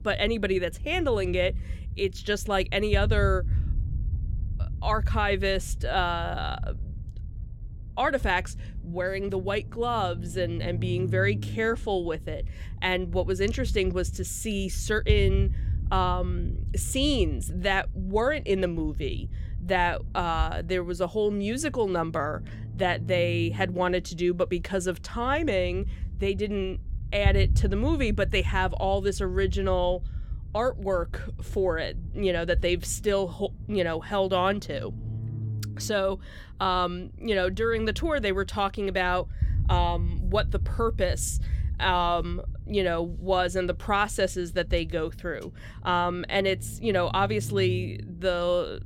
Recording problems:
low rumble; faint; throughout; 20 dB below the speech

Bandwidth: 16.5 kHz